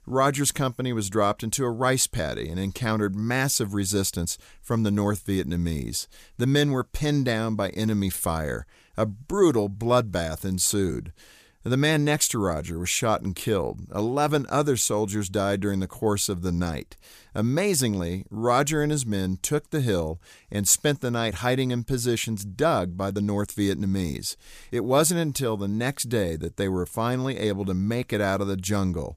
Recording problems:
none

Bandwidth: 15 kHz